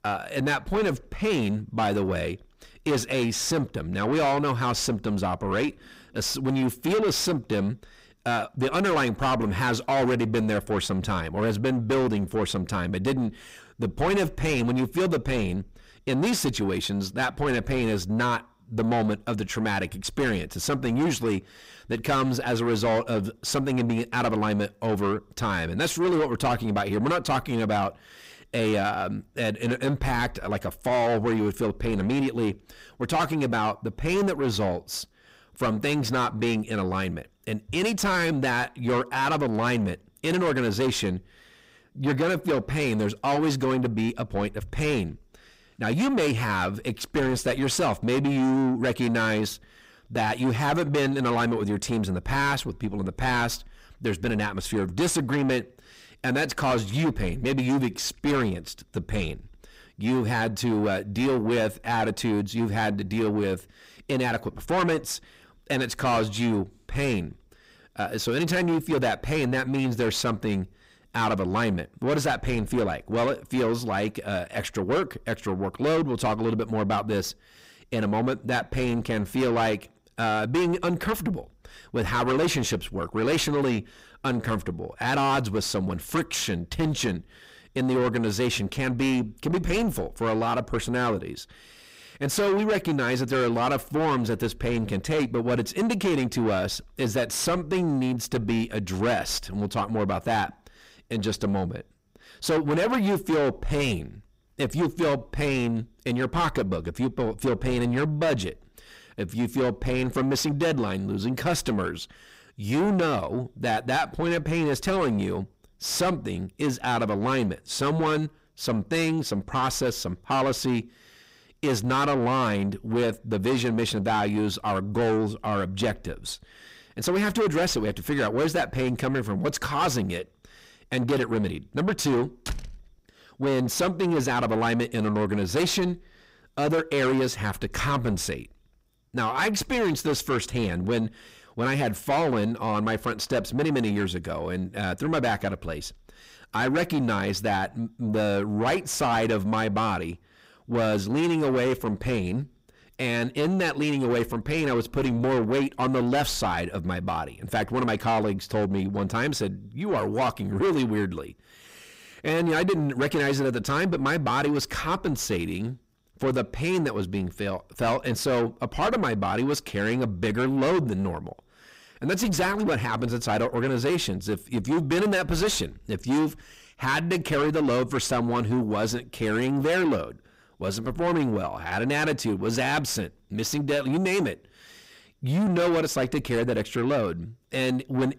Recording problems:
distortion; heavy; 6 dB below the speech
door banging; noticeable; at 2:12; peak 10 dB below the speech

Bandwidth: 15.5 kHz